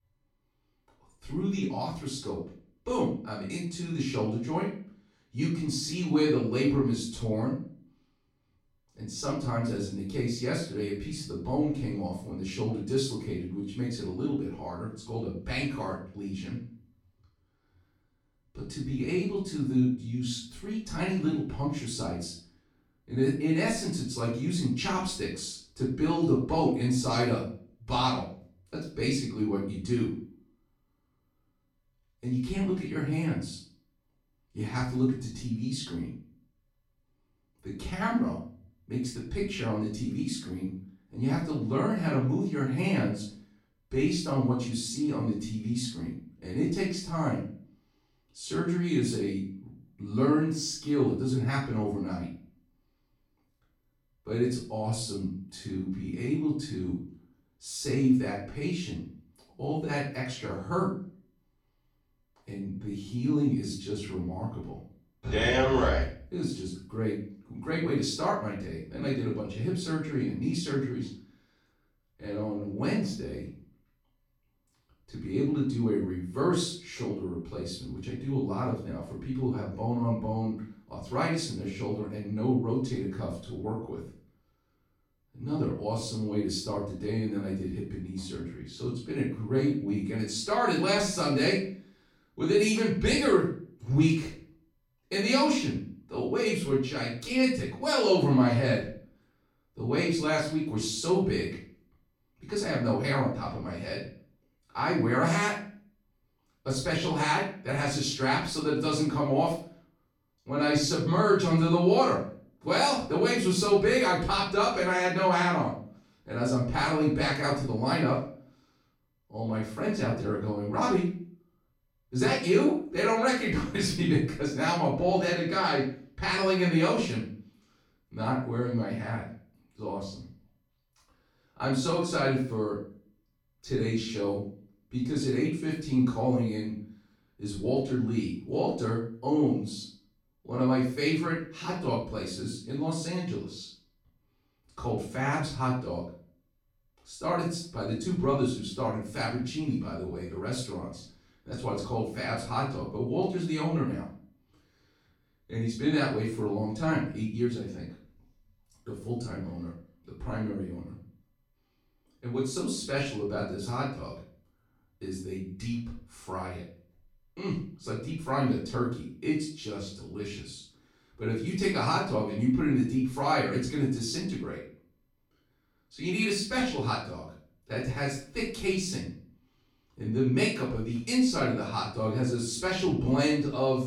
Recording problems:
off-mic speech; far
room echo; noticeable; dies away in 0.4 s

